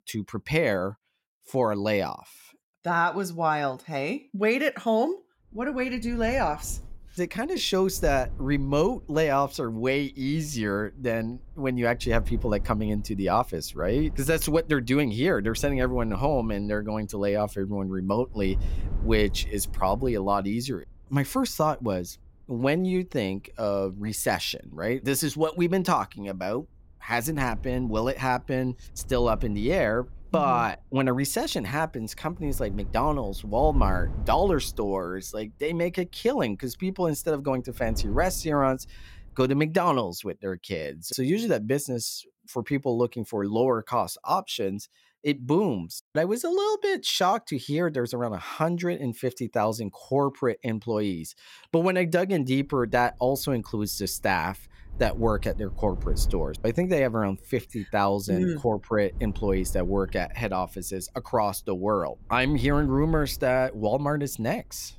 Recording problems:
wind noise on the microphone; occasional gusts; from 5.5 to 39 s and from 53 s on; 25 dB below the speech

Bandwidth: 16.5 kHz